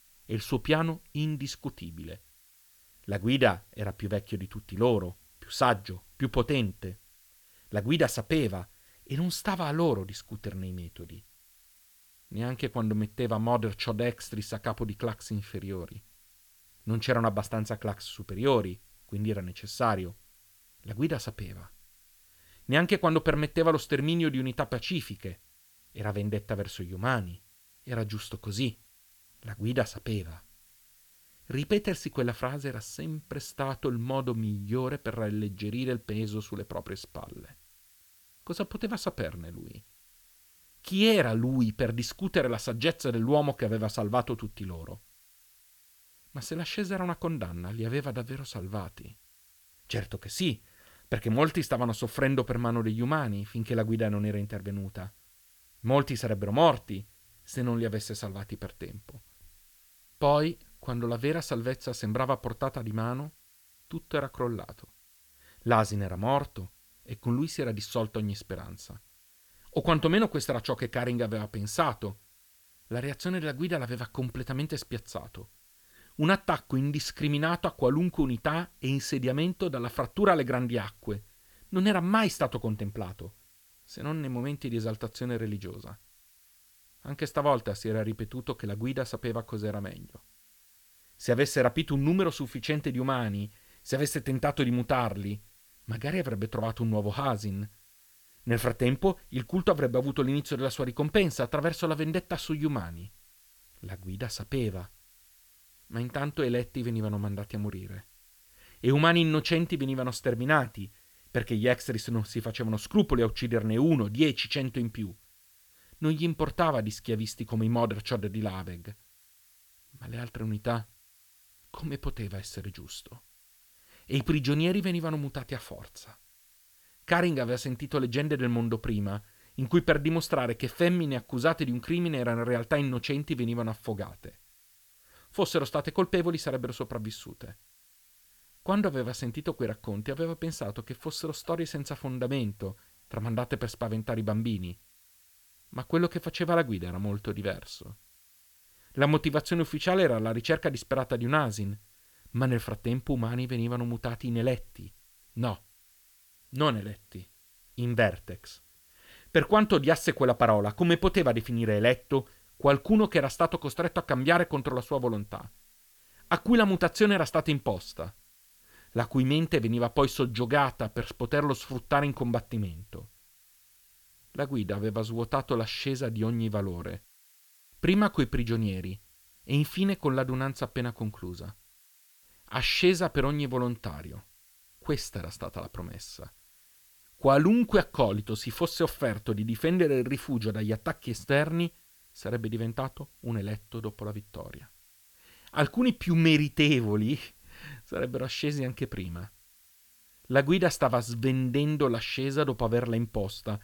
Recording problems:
hiss; faint; throughout; 30 dB below the speech

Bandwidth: 18.5 kHz